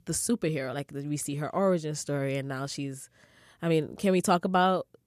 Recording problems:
none

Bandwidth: 14.5 kHz